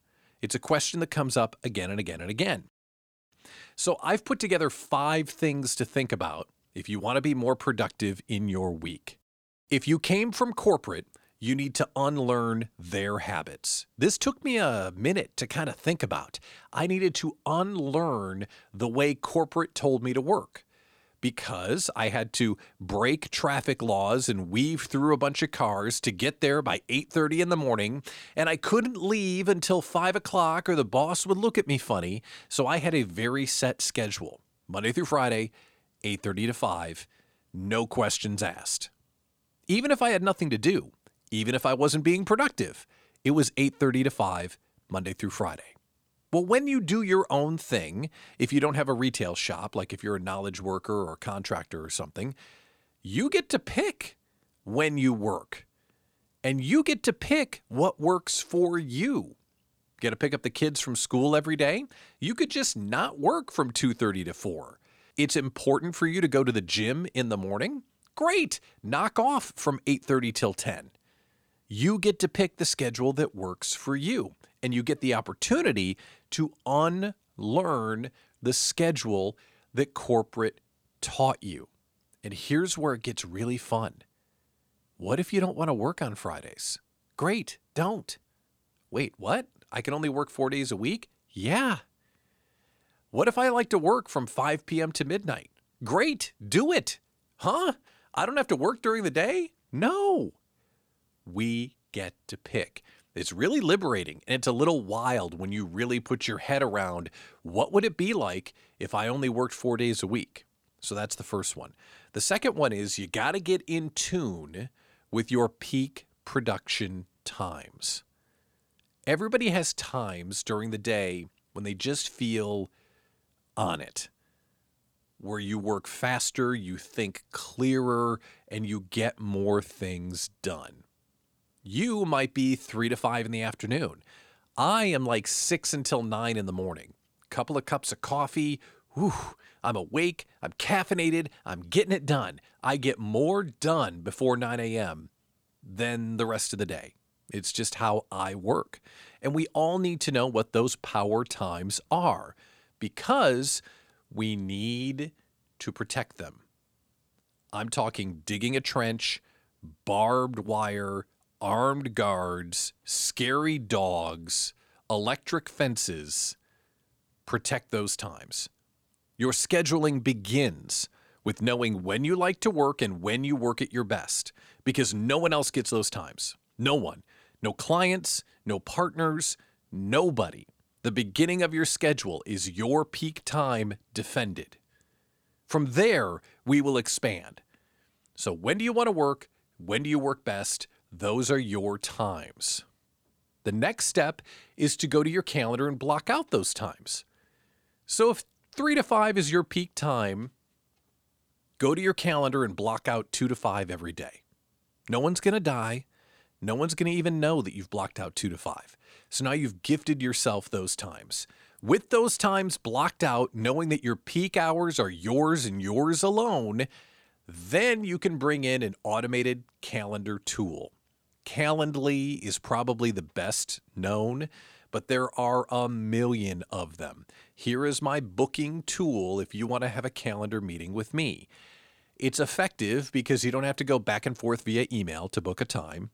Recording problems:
none

